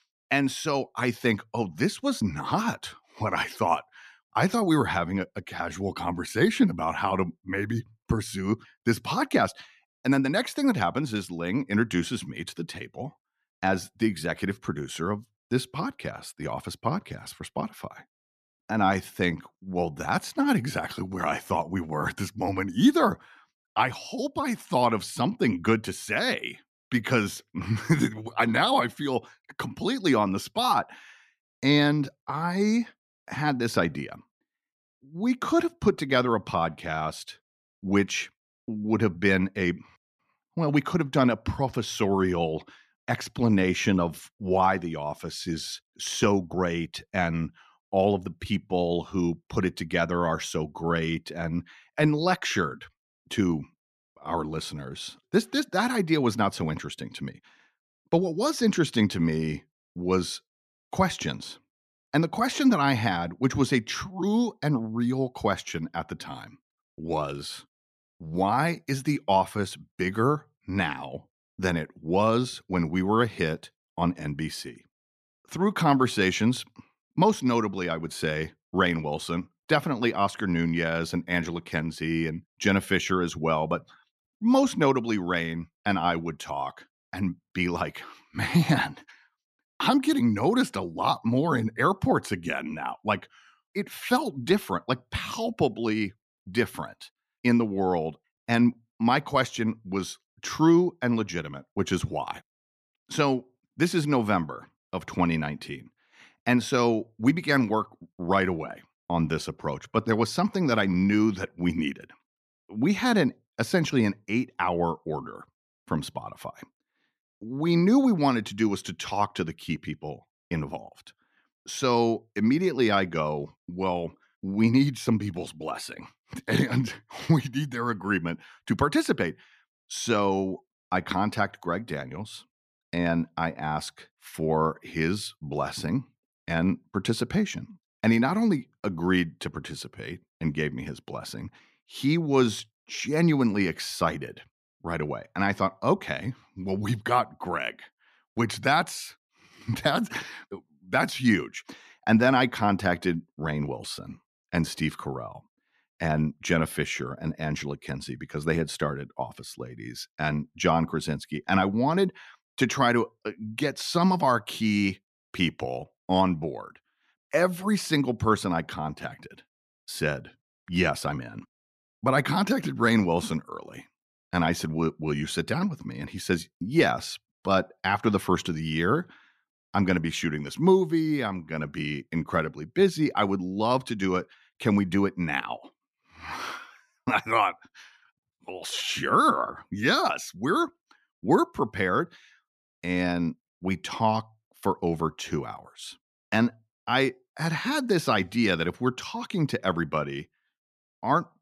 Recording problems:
none

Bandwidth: 14 kHz